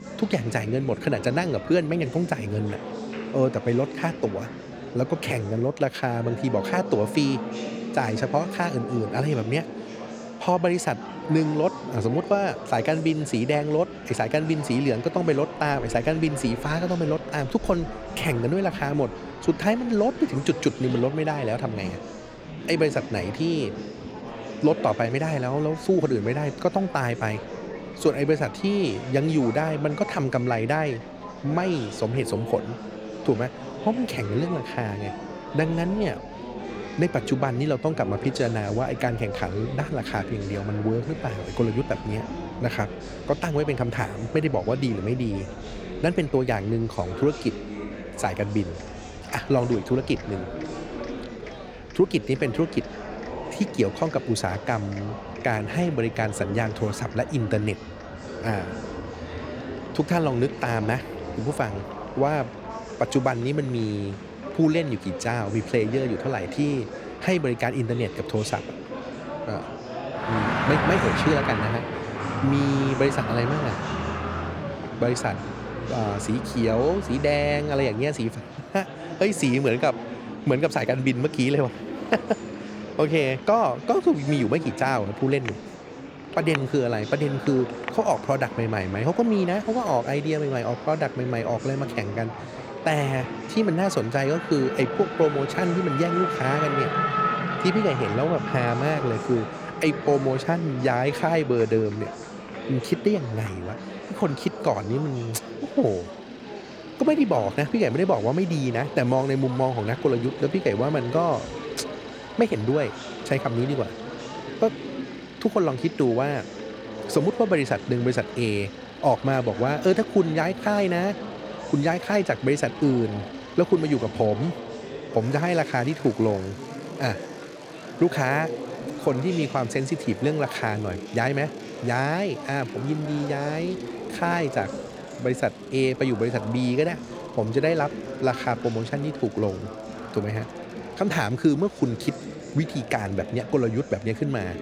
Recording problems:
traffic noise; noticeable; throughout; 10 dB below the speech
murmuring crowd; noticeable; throughout; 10 dB below the speech

